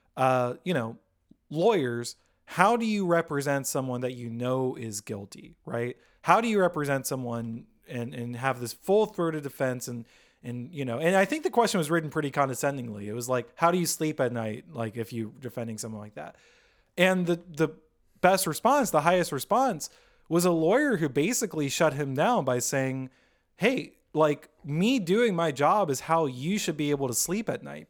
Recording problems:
none

